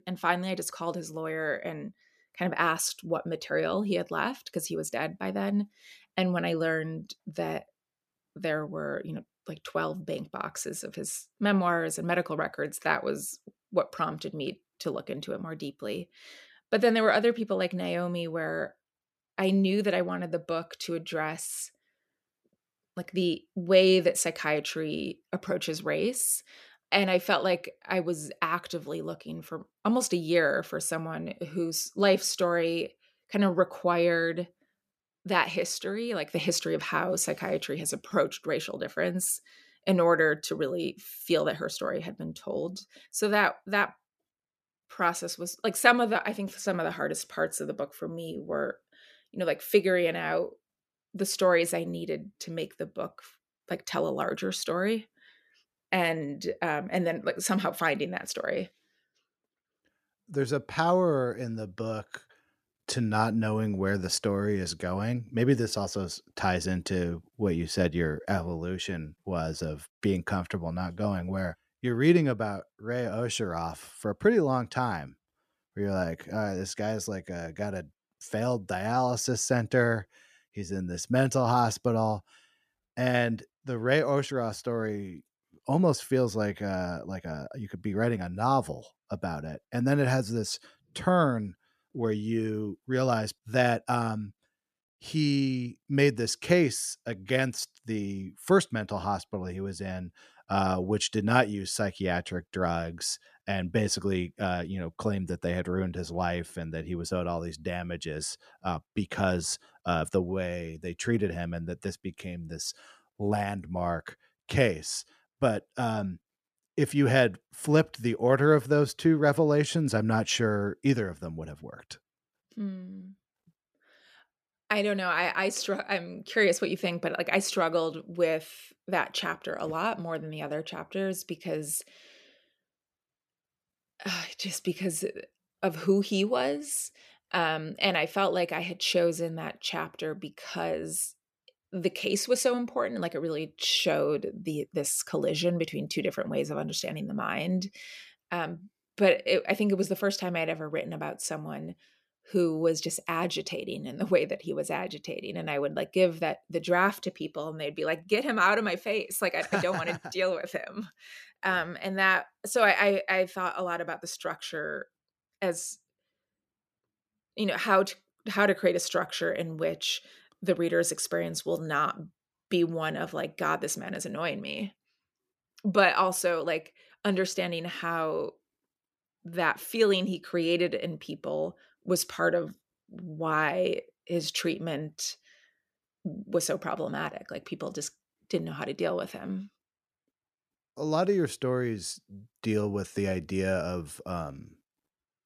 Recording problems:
none

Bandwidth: 14.5 kHz